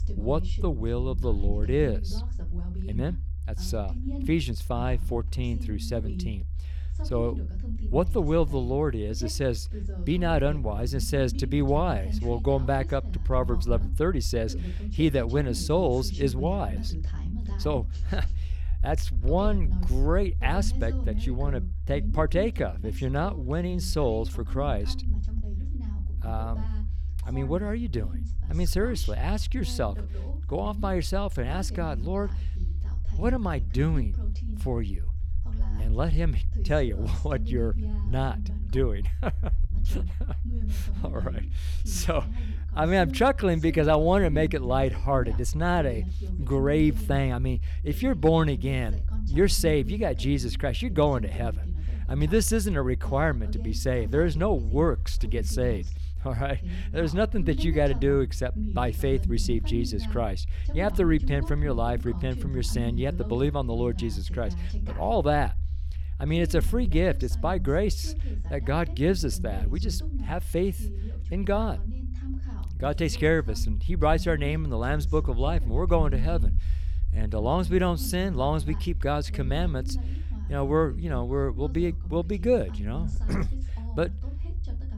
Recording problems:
voice in the background; noticeable; throughout; 15 dB below the speech
low rumble; faint; throughout; 20 dB below the speech

